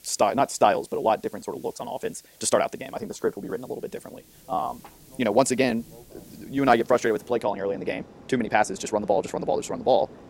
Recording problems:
wrong speed, natural pitch; too fast; 1.6 times normal speed
train or aircraft noise; faint; throughout; 25 dB below the speech
hiss; faint; until 7.5 s; 25 dB below the speech

